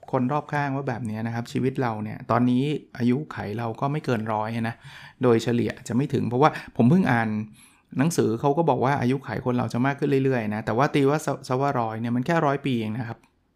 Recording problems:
none

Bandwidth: 15.5 kHz